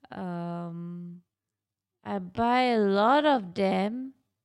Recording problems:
wrong speed, natural pitch; too slow; 0.6 times normal speed

